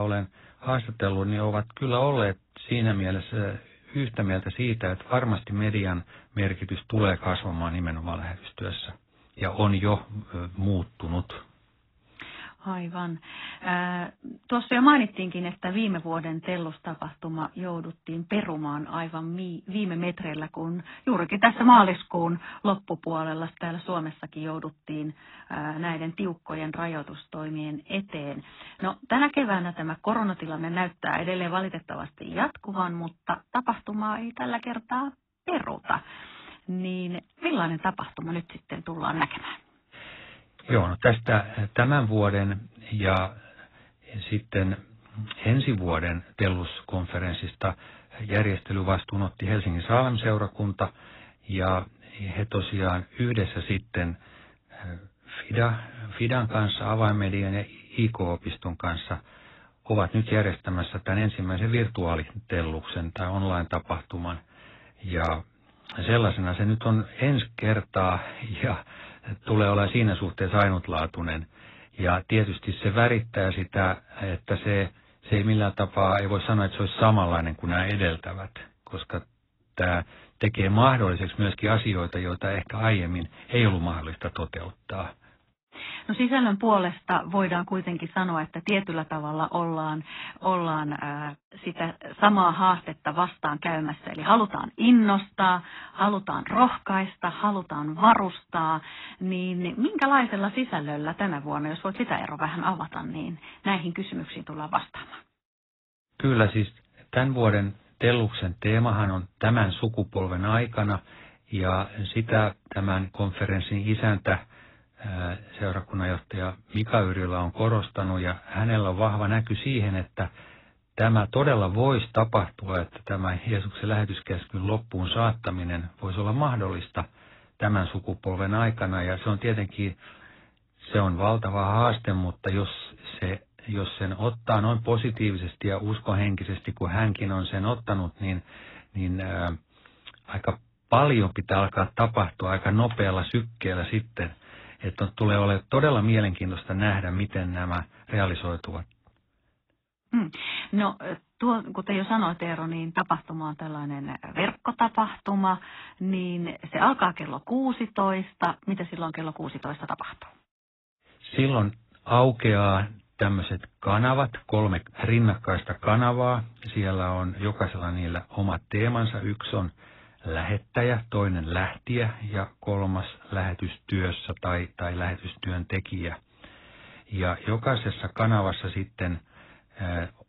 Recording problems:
garbled, watery; badly; nothing above 4 kHz
abrupt cut into speech; at the start

